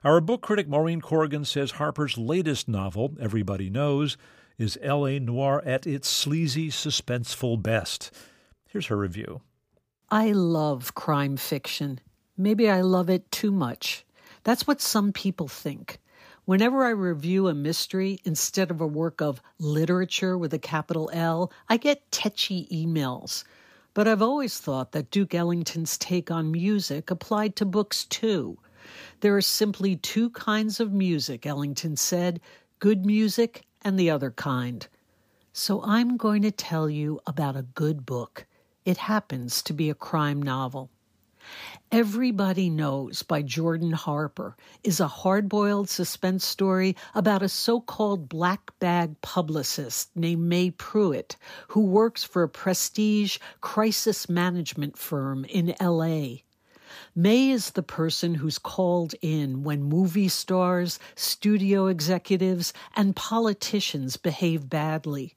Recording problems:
none

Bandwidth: 15 kHz